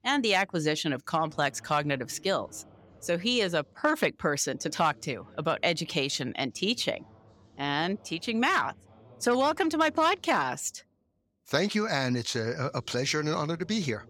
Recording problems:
voice in the background; faint; throughout; 30 dB below the speech

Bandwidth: 18.5 kHz